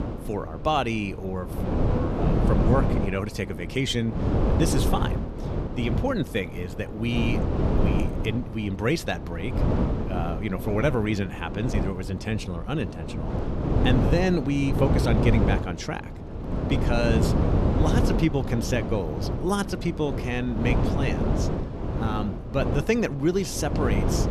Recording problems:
wind noise on the microphone; heavy; 3 dB below the speech

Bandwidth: 13.5 kHz